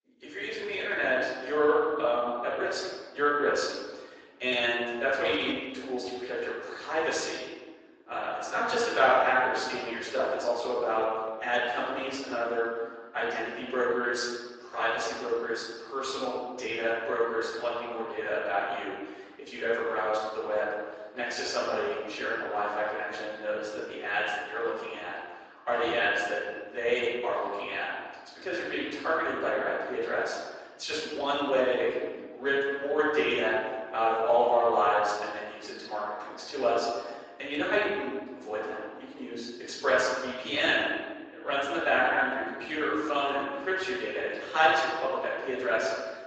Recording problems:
room echo; strong; dies away in 1.4 s
off-mic speech; far
thin; somewhat; fading below 350 Hz
garbled, watery; slightly; nothing above 7.5 kHz

